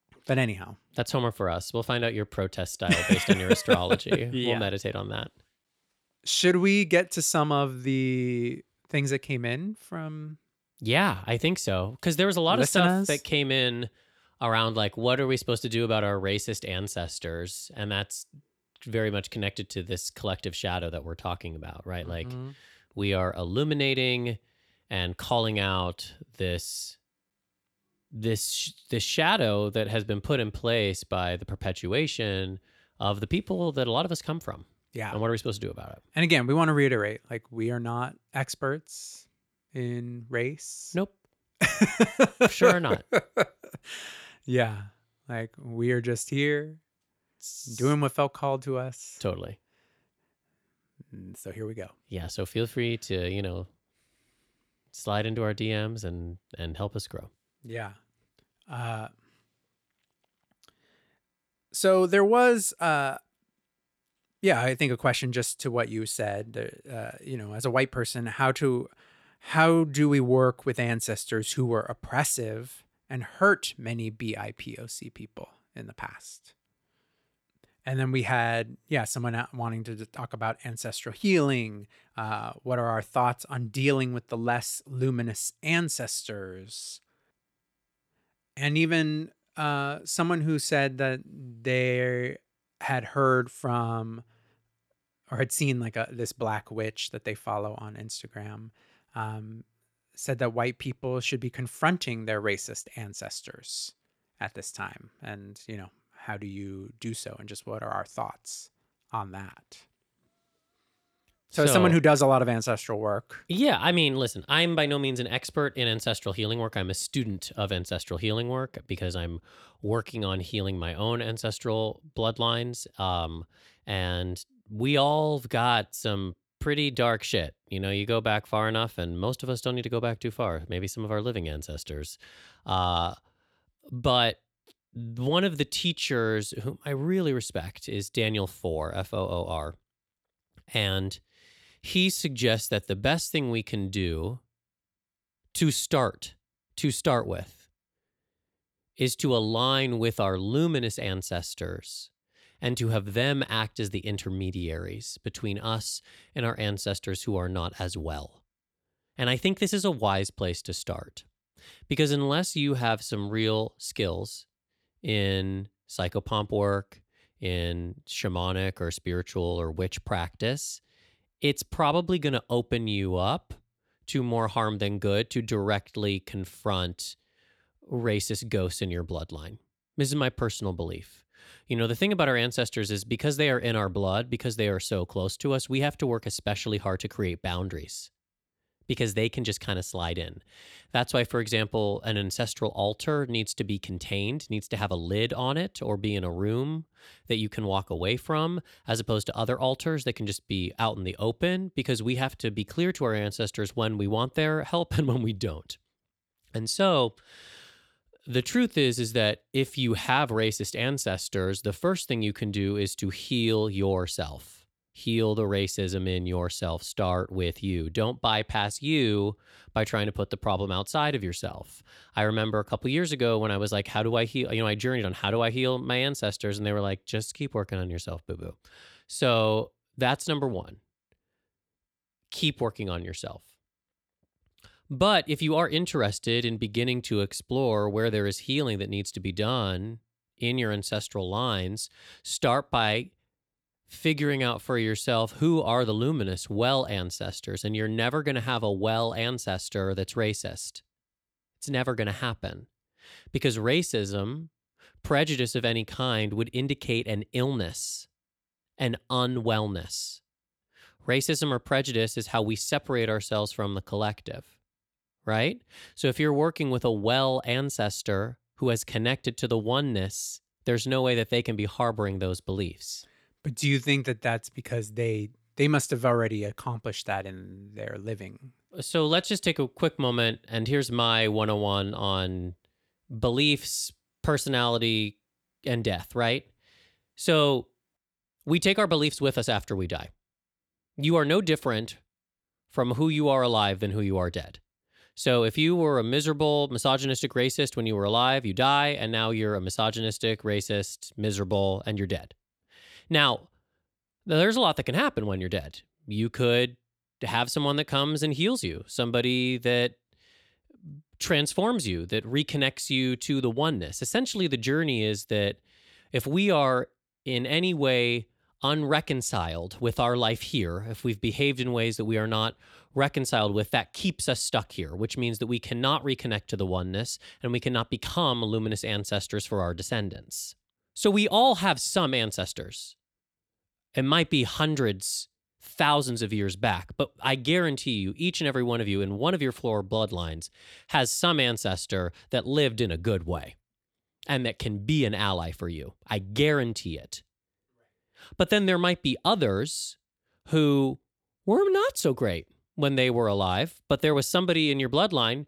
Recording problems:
none

